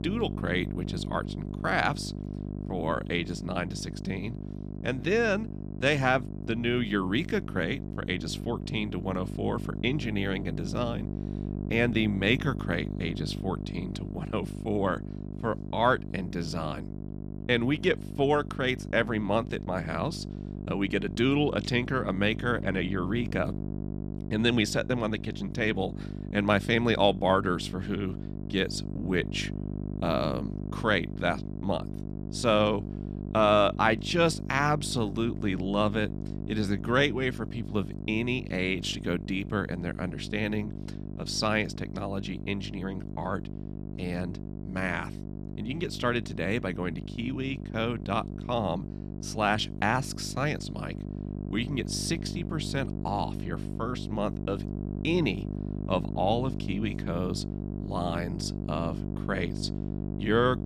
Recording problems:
electrical hum; noticeable; throughout; 50 Hz, 15 dB below the speech

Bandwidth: 14.5 kHz